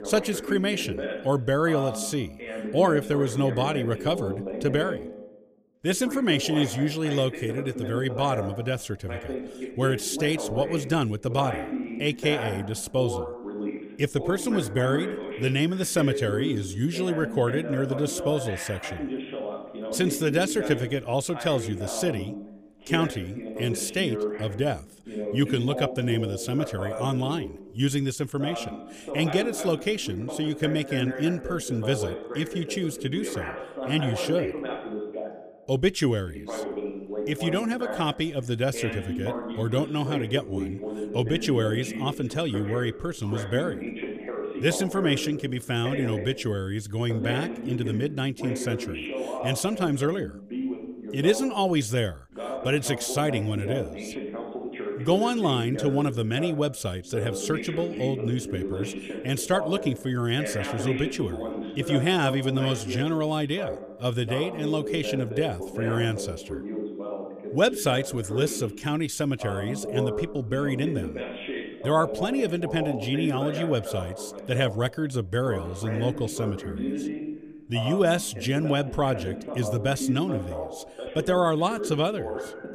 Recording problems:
voice in the background; loud; throughout; 7 dB below the speech

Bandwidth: 15 kHz